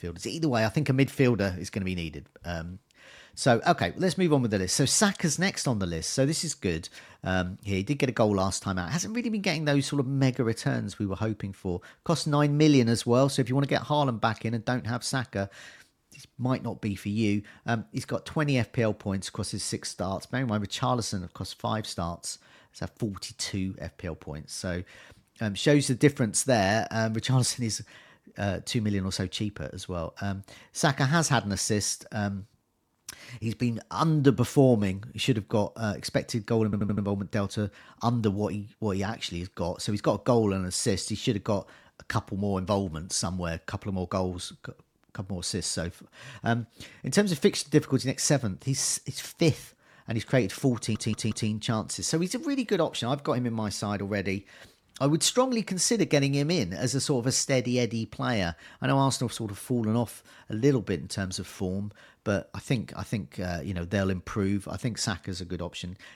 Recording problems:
audio stuttering; at 37 s and at 51 s

